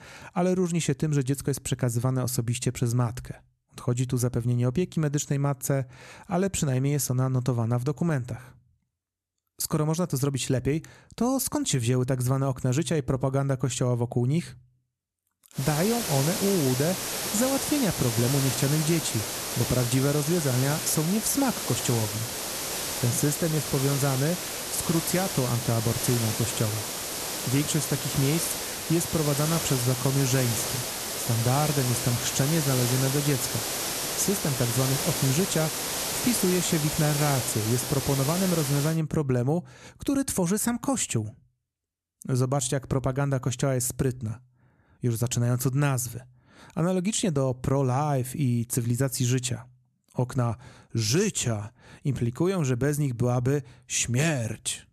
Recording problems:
hiss; loud; from 16 to 39 s; 3 dB below the speech

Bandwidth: 13.5 kHz